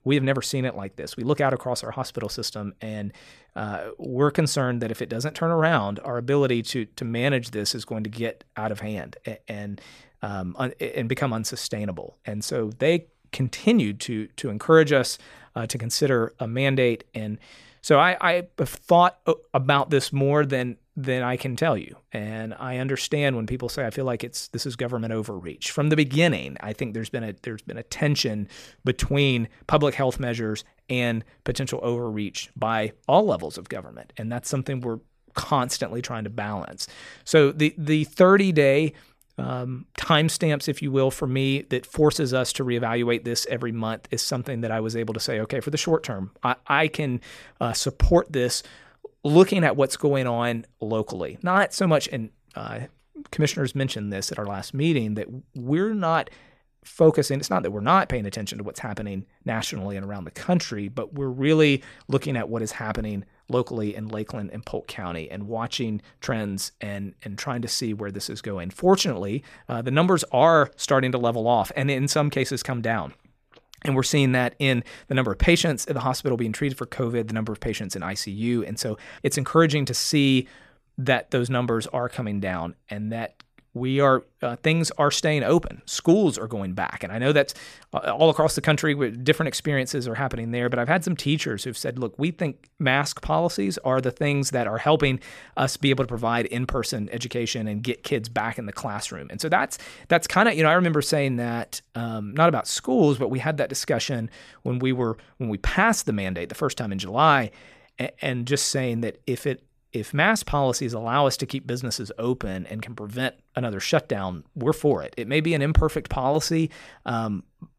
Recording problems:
none

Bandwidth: 14.5 kHz